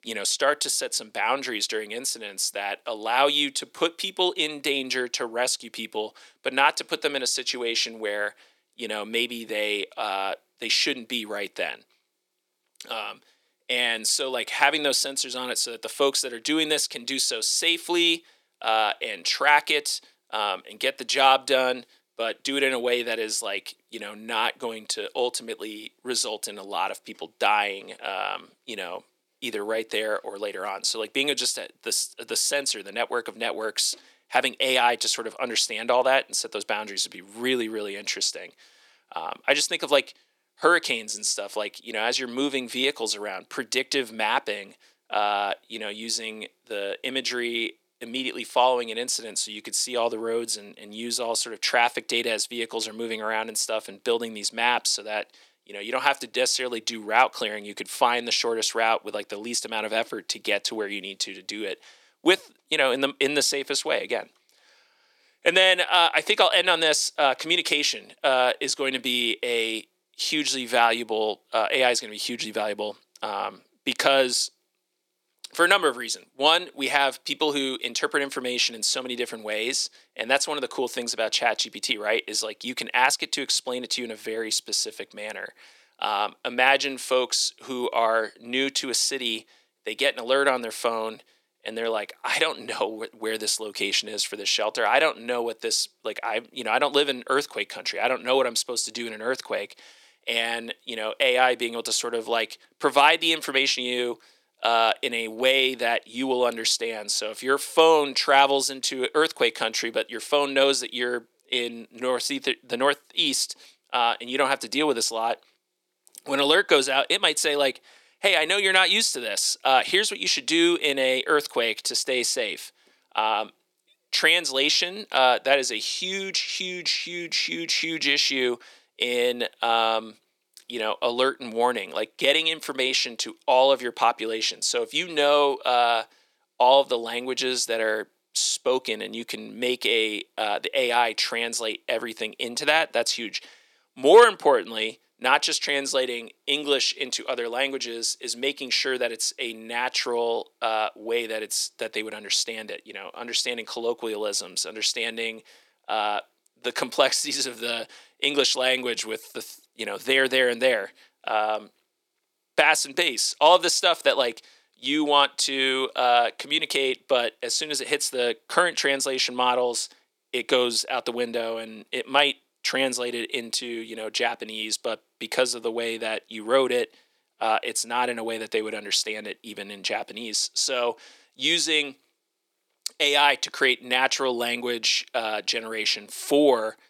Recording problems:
thin; somewhat; fading below 300 Hz

